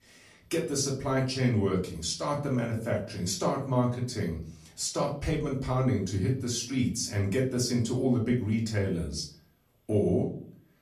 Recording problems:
off-mic speech; far
room echo; slight; dies away in 0.4 s

